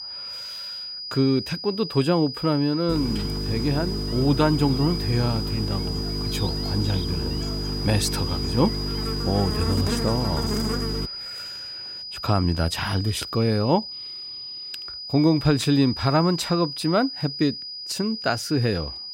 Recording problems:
electrical hum; loud; from 3 to 11 s; 50 Hz, 7 dB below the speech
high-pitched whine; loud; throughout; 5 kHz, 7 dB below the speech

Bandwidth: 16 kHz